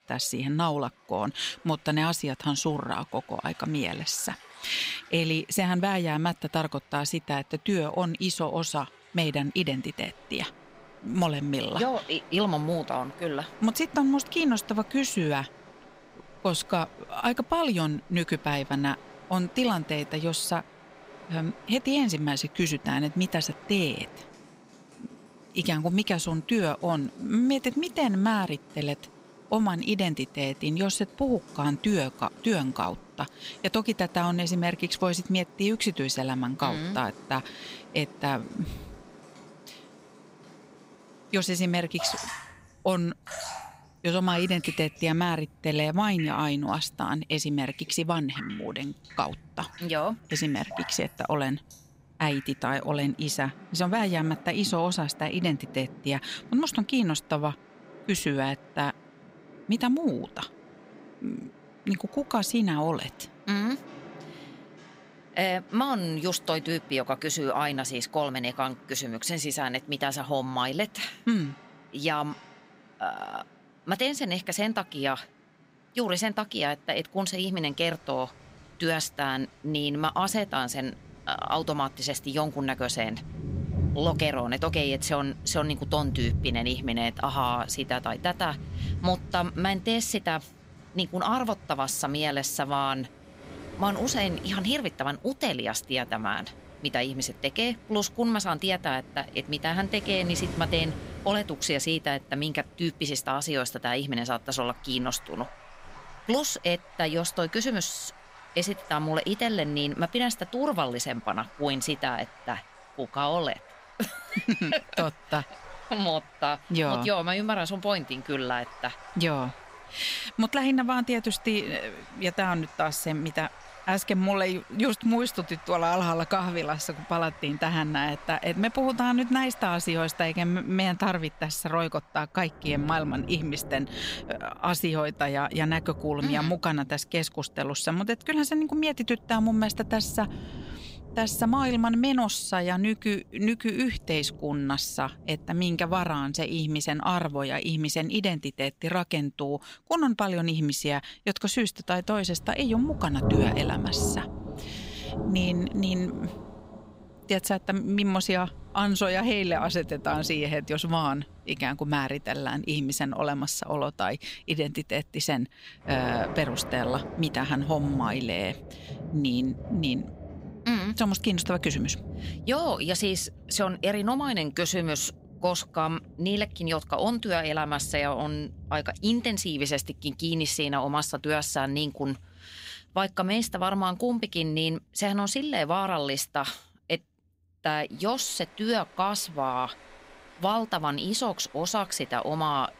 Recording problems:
rain or running water; noticeable; throughout; 15 dB below the speech

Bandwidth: 15.5 kHz